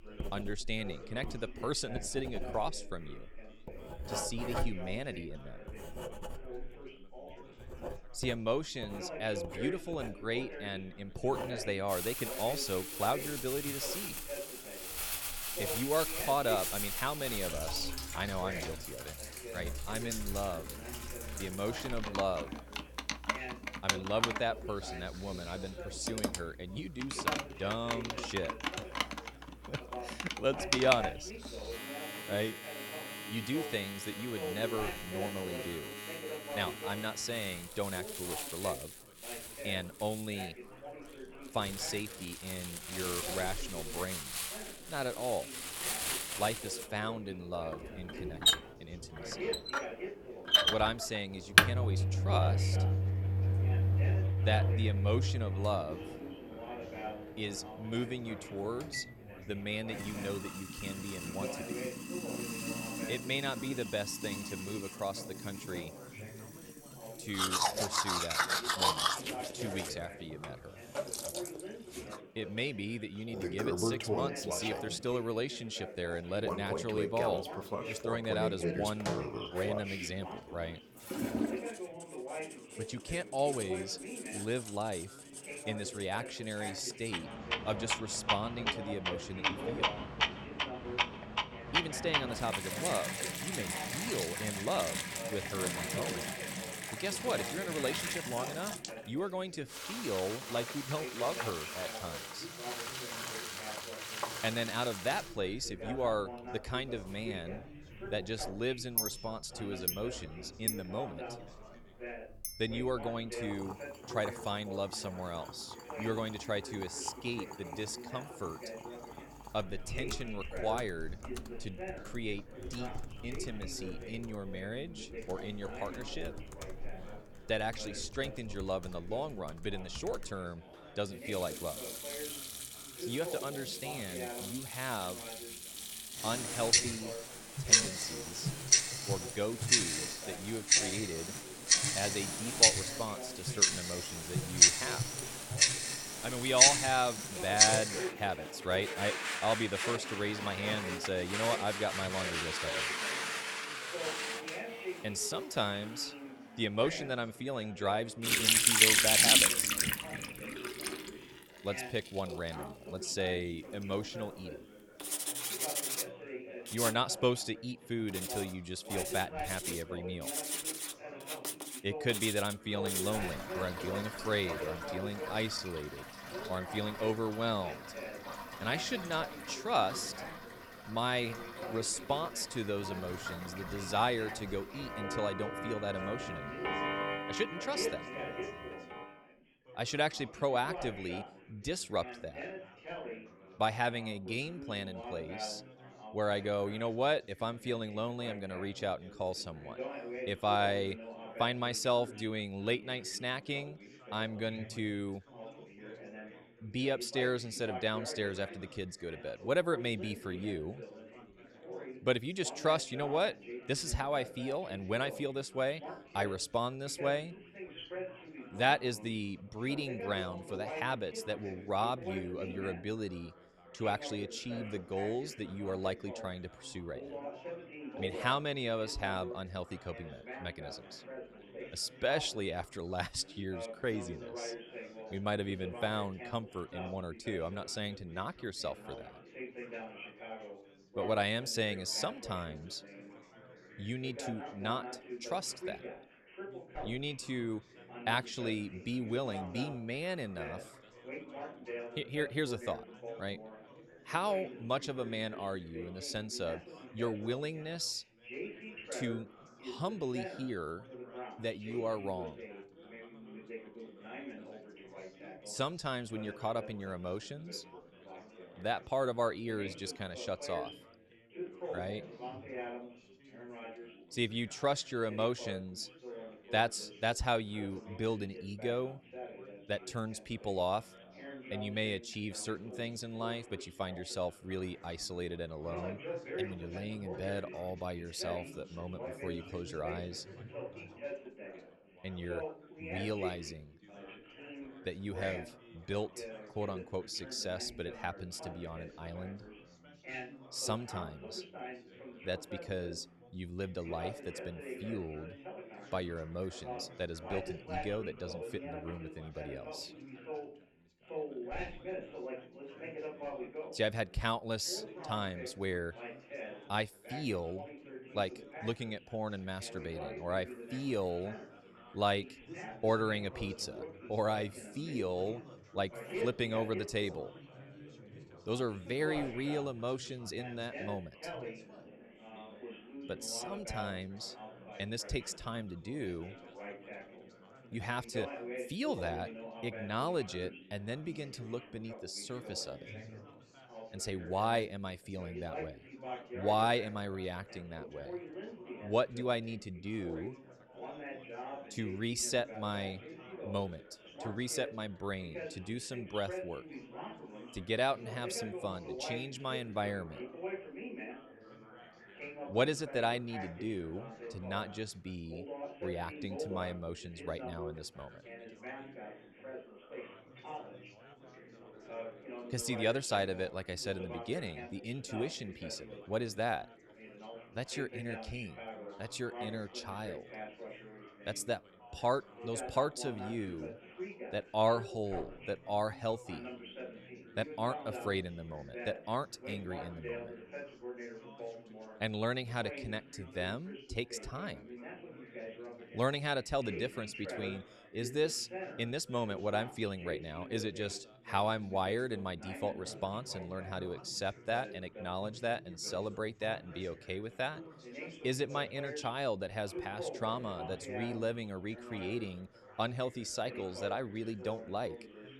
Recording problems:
household noises; very loud; until 3:09; 4 dB above the speech
background chatter; loud; throughout; 4 voices, 10 dB below the speech

